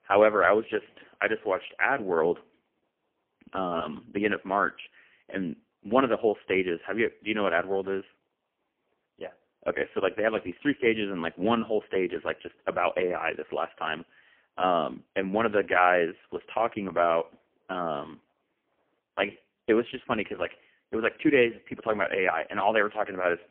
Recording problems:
phone-call audio; poor line; nothing above 3 kHz

